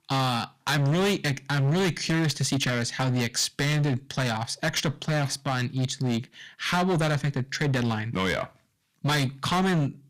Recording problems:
distortion; heavy; 17% of the sound clipped

